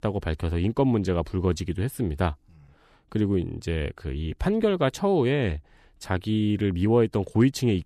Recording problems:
none

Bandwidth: 13.5 kHz